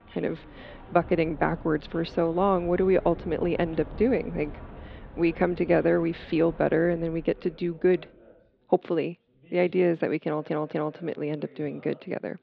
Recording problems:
muffled; very; fading above 3.5 kHz
rain or running water; noticeable; until 7.5 s; 20 dB below the speech
background chatter; faint; throughout; 2 voices, 25 dB below the speech
audio stuttering; at 10 s

